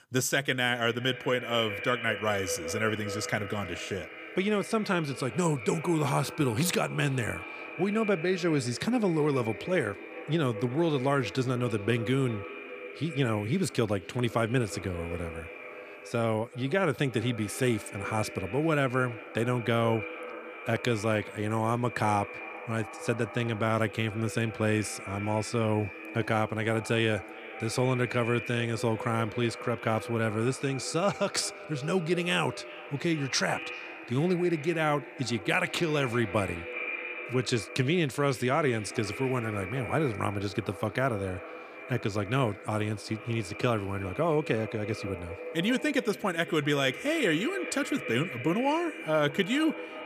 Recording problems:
echo of what is said; strong; throughout; 380 ms later, 10 dB below the speech

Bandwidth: 15 kHz